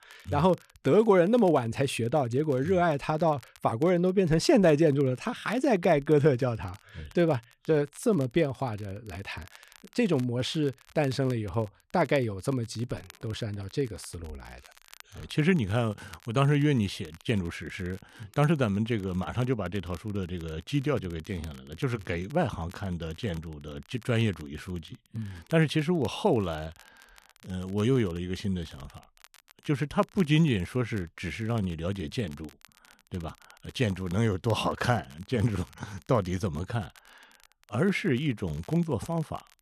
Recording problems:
crackle, like an old record; faint; 25 dB below the speech

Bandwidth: 13.5 kHz